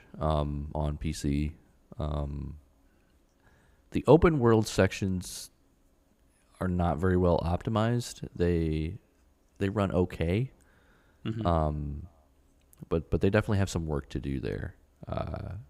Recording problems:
none

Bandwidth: 15.5 kHz